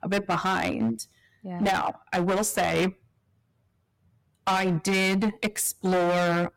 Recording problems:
distortion; heavy; 14% of the sound clipped

